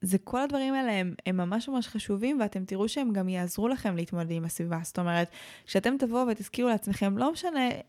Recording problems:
none

